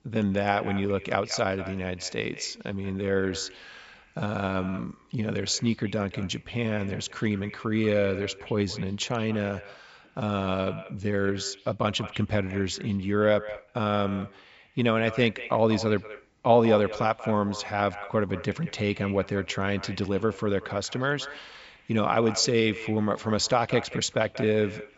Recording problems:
echo of what is said; noticeable; throughout; 190 ms later, 15 dB below the speech
high frequencies cut off; noticeable; nothing above 8 kHz

